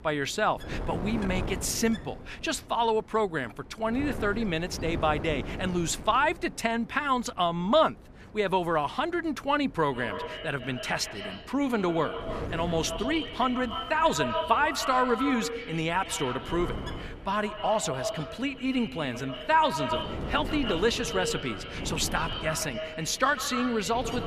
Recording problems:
echo of what is said; strong; from 10 s on; 140 ms later, 8 dB below the speech
wind noise on the microphone; occasional gusts; 15 dB below the speech

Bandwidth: 14.5 kHz